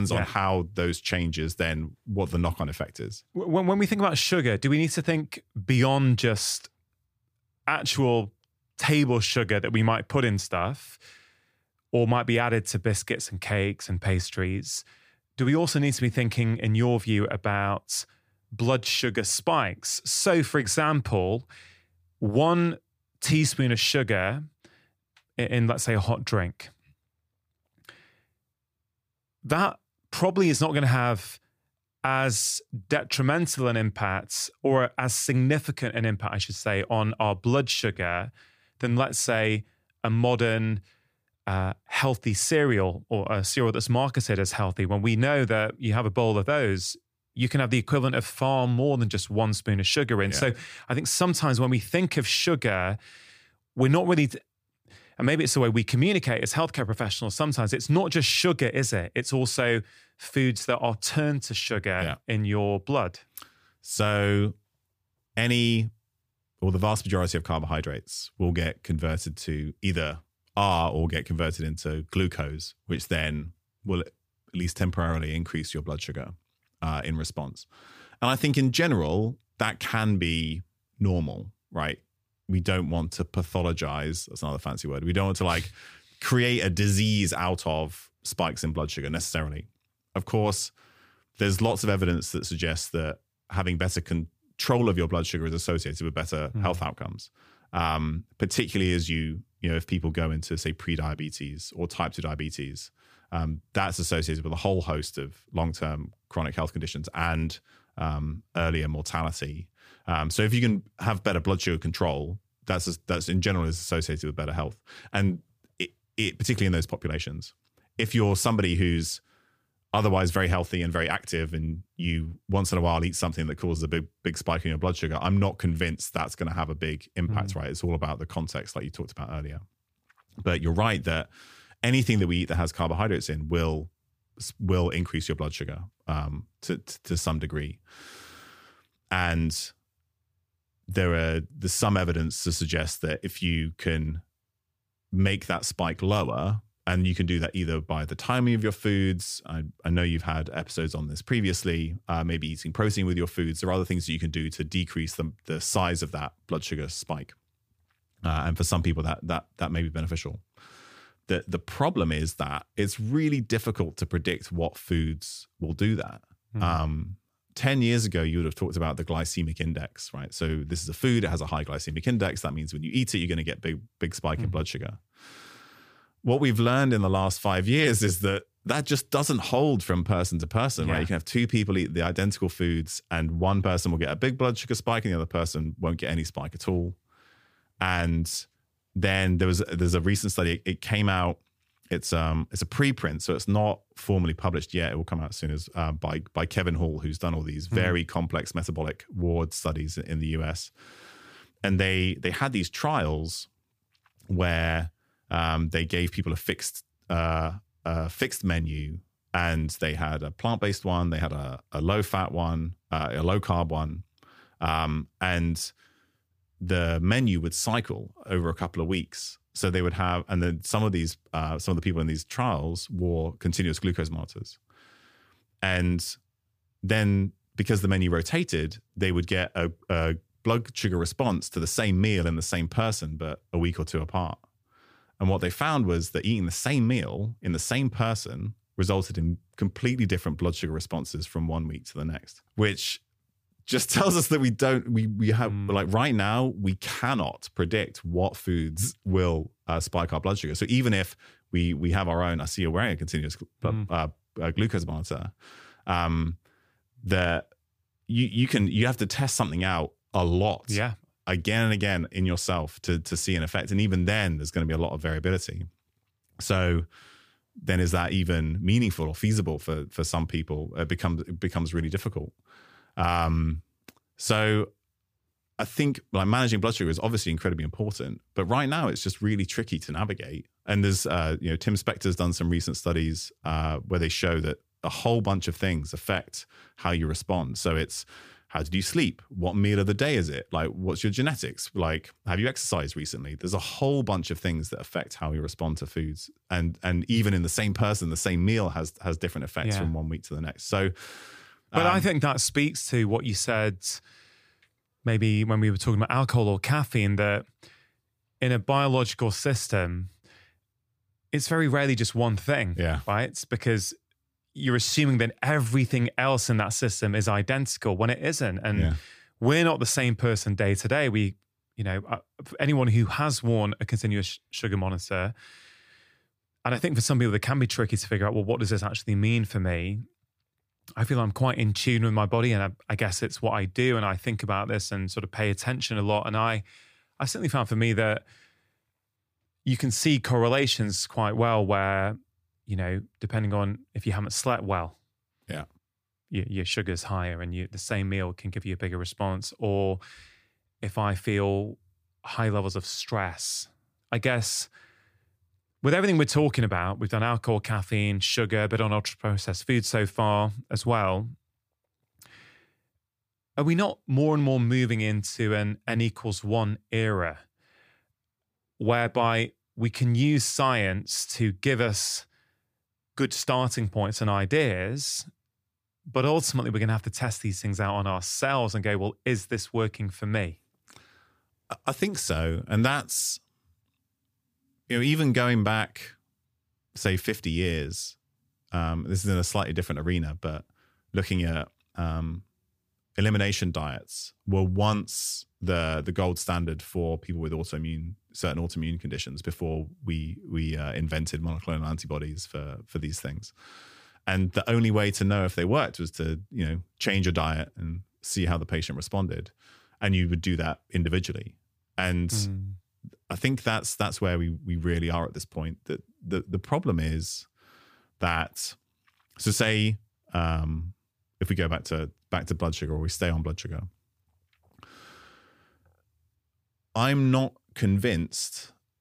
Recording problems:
abrupt cut into speech; at the start

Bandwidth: 15 kHz